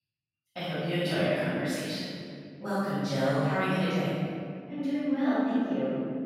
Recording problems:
room echo; strong; dies away in 2.3 s
off-mic speech; far

